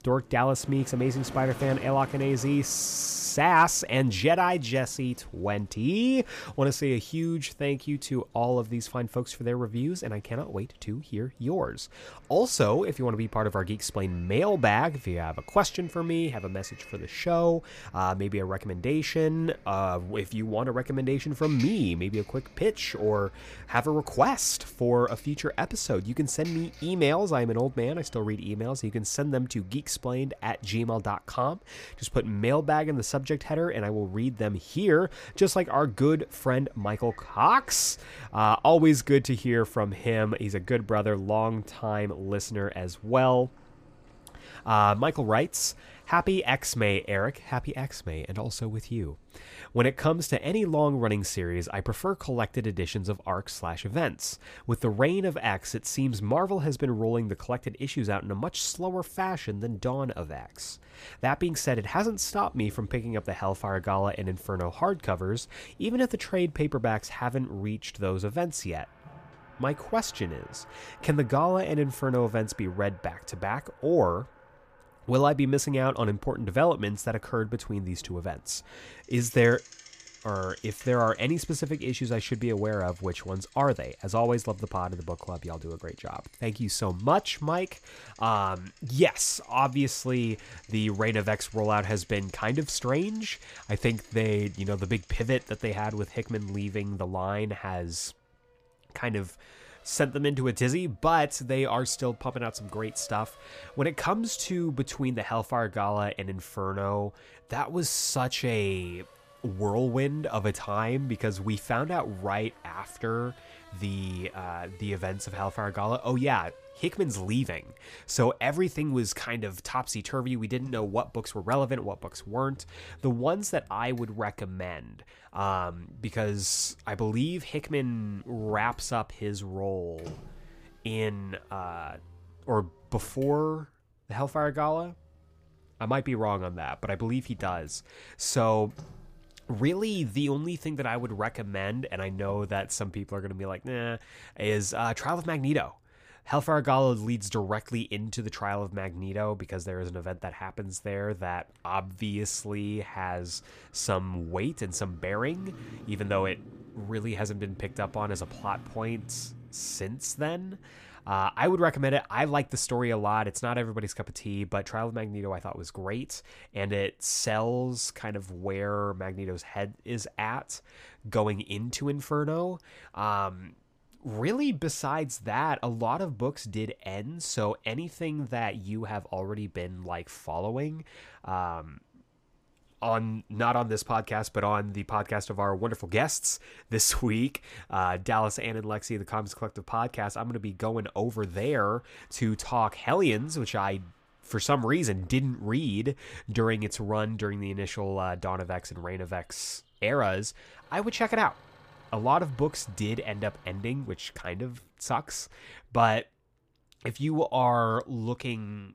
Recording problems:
traffic noise; faint; throughout; 25 dB below the speech

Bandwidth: 15 kHz